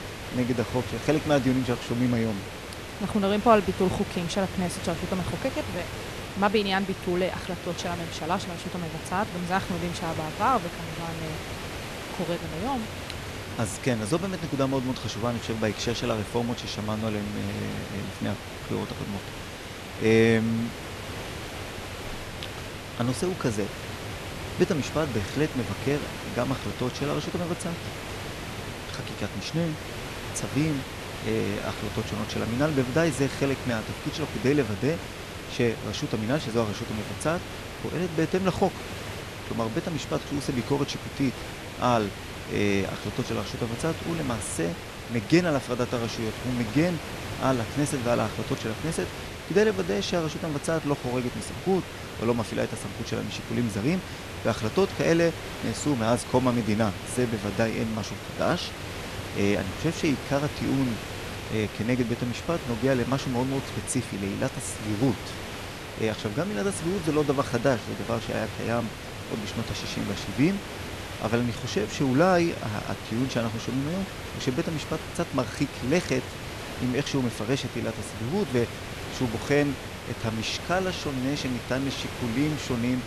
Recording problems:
hiss; loud; throughout; 8 dB below the speech

